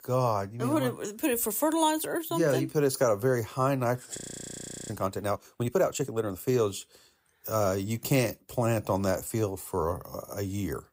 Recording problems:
audio freezing; at 4 s for 0.5 s

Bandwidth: 15.5 kHz